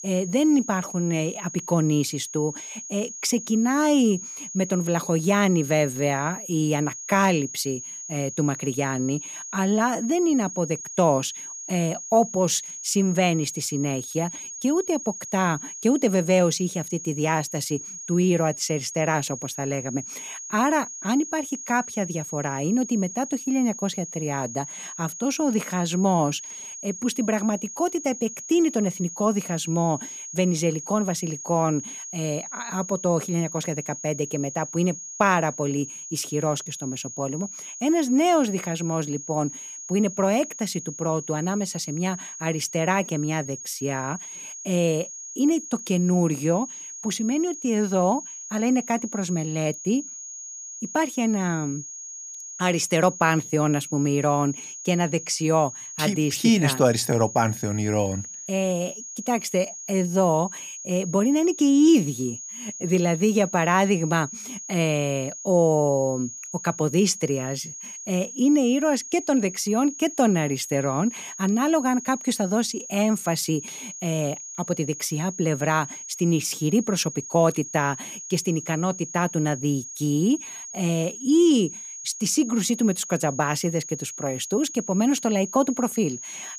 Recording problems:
high-pitched whine; noticeable; throughout; 6.5 kHz, 10 dB below the speech

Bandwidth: 15 kHz